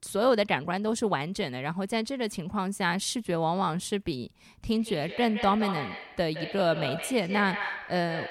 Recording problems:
echo of what is said; strong; from 4.5 s on; 170 ms later, 8 dB below the speech

